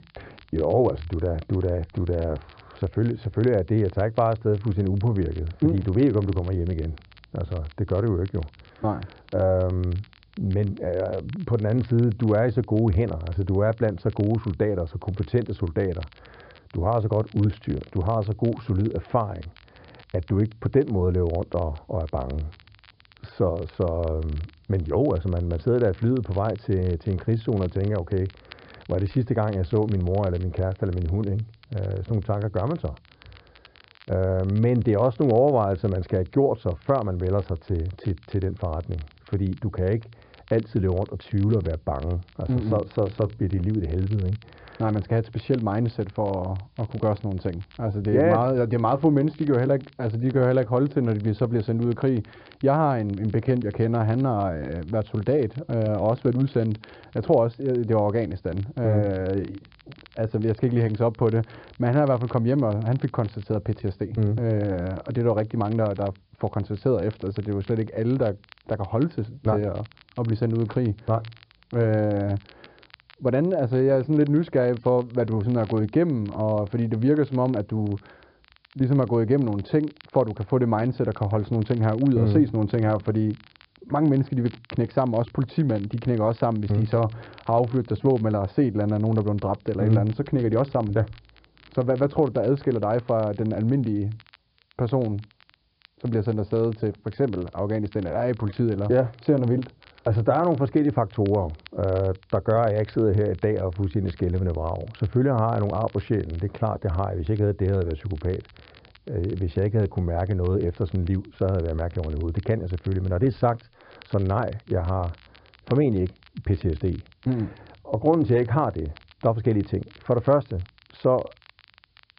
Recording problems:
high frequencies cut off; severe; nothing above 5 kHz
muffled; very slightly; fading above 1.5 kHz
crackle, like an old record; faint; 30 dB below the speech
hiss; very faint; throughout; 45 dB below the speech

